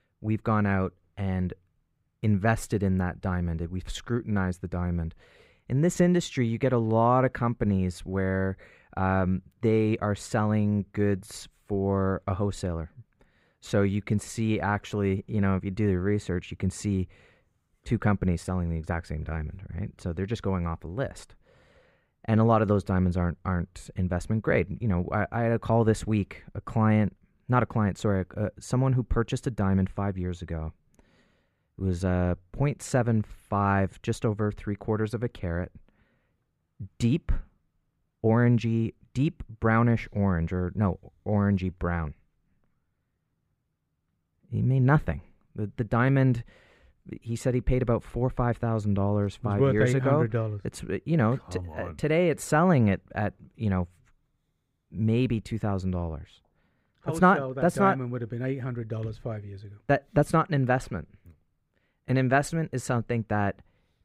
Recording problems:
muffled; slightly; fading above 3 kHz

